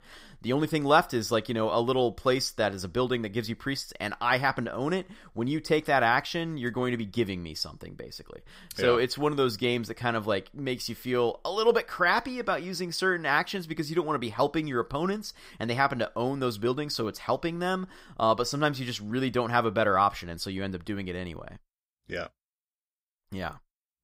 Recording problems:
none

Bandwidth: 15.5 kHz